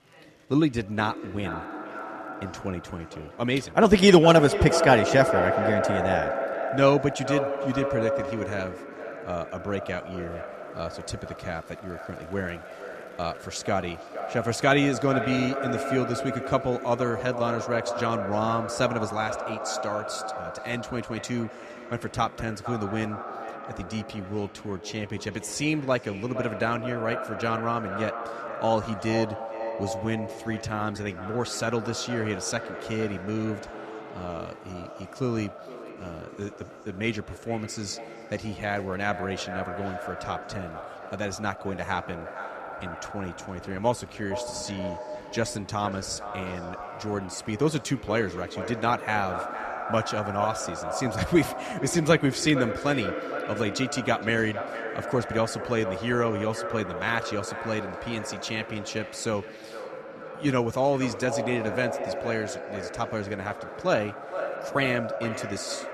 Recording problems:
echo of what is said; strong; throughout; 460 ms later, 6 dB below the speech
murmuring crowd; faint; throughout; 25 dB below the speech

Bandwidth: 13.5 kHz